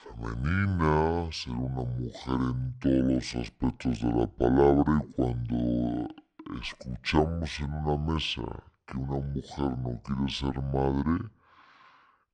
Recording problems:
wrong speed and pitch; too slow and too low; 0.6 times normal speed

